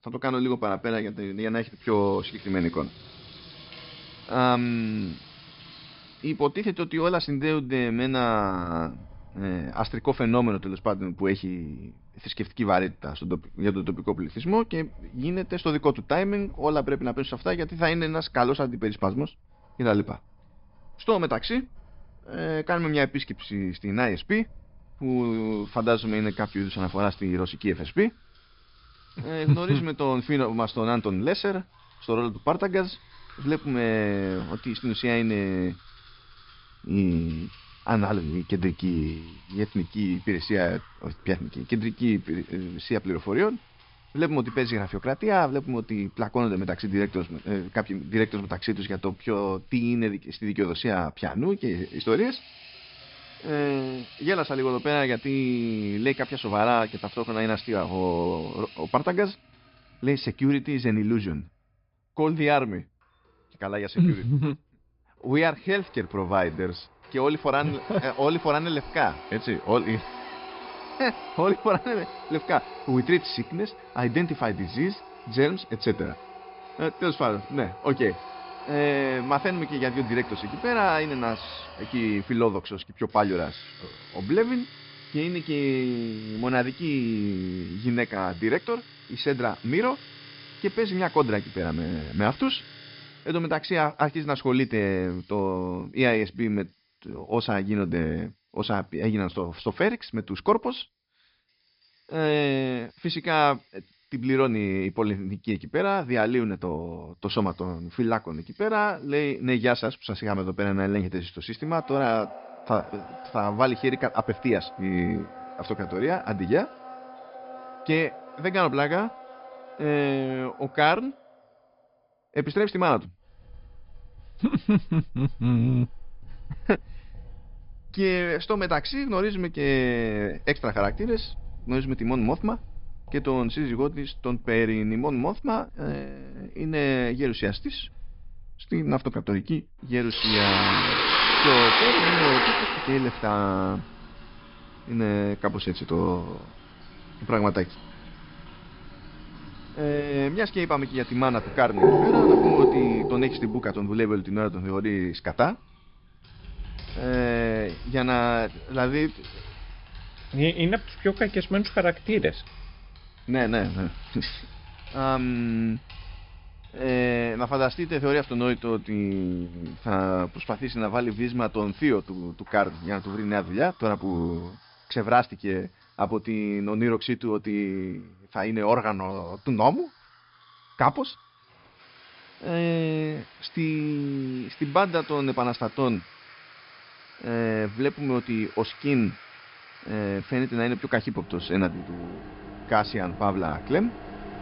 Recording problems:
high frequencies cut off; noticeable; nothing above 5.5 kHz
household noises; loud; throughout; 4 dB below the speech

